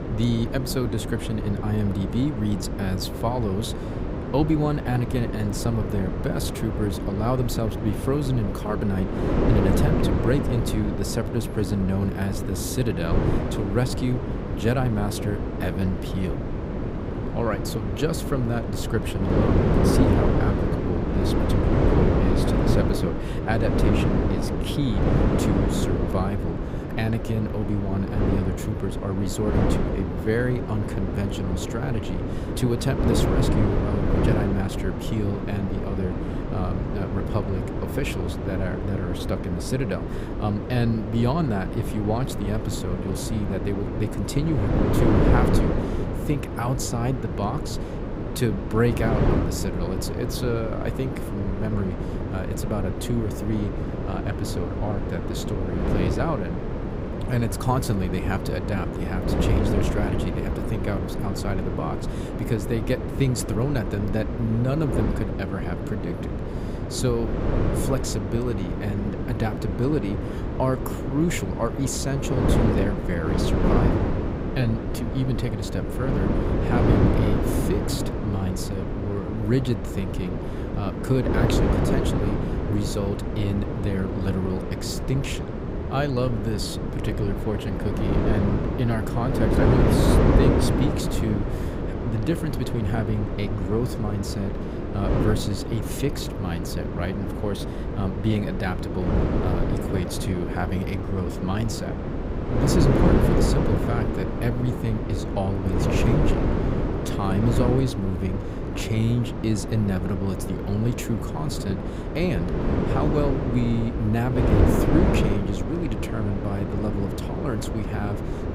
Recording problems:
wind noise on the microphone; heavy; 1 dB above the speech

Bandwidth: 15.5 kHz